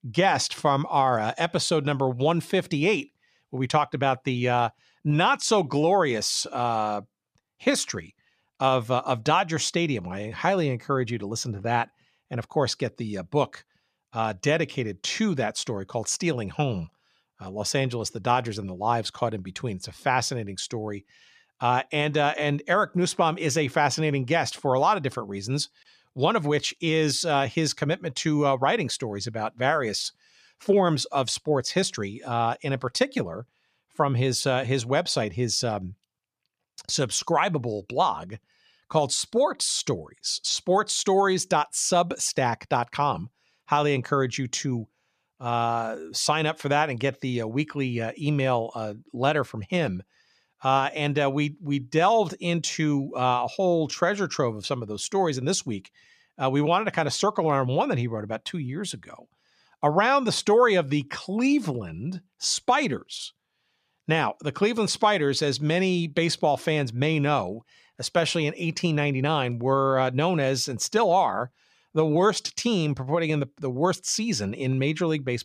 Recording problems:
none

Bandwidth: 14.5 kHz